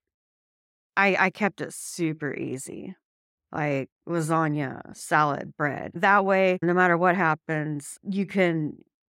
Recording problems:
none

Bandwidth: 16.5 kHz